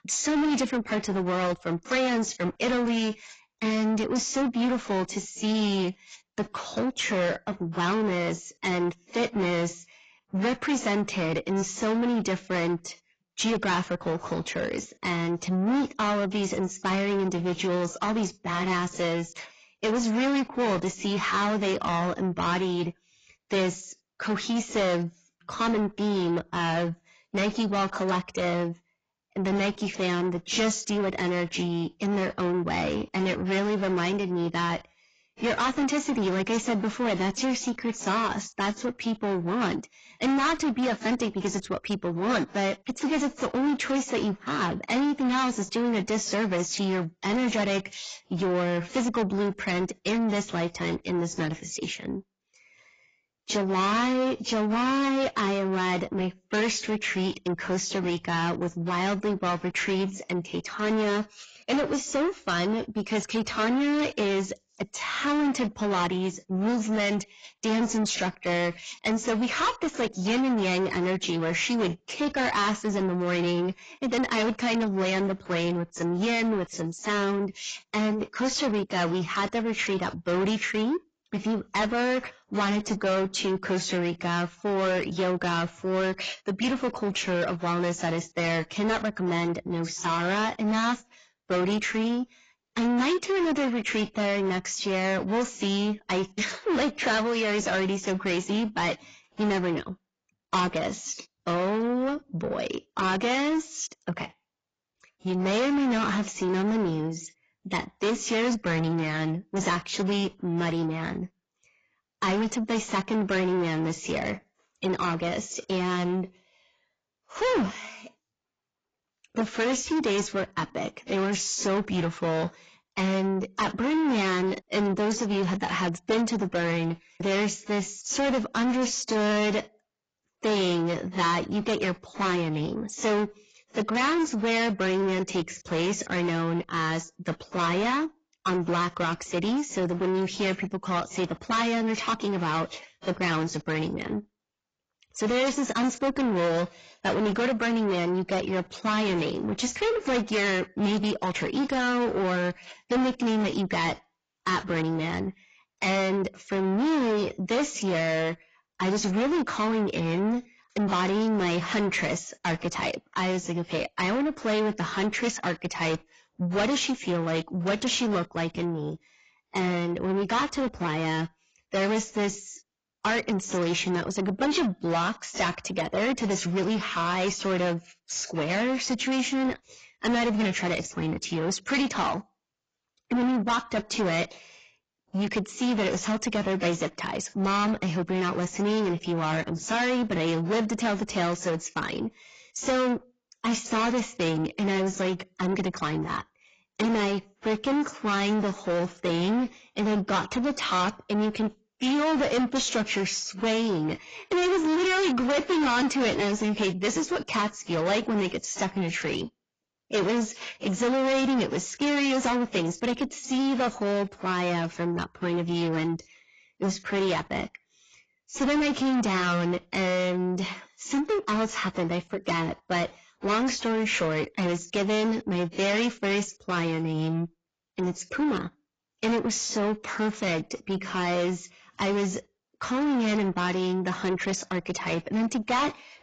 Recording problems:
distortion; heavy; 6 dB below the speech
garbled, watery; badly; nothing above 7.5 kHz

